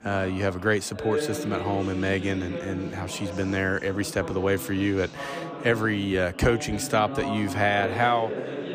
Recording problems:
background chatter; loud; throughout; 3 voices, 8 dB below the speech

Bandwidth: 15 kHz